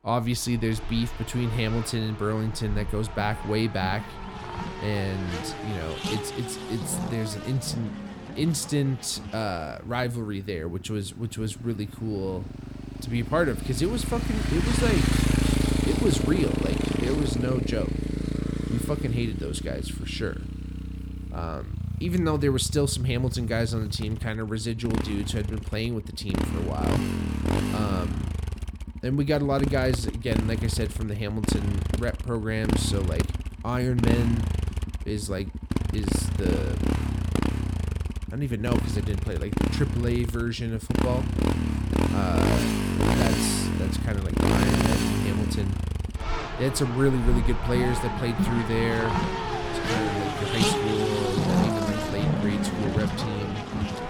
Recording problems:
traffic noise; very loud; throughout; 1 dB above the speech

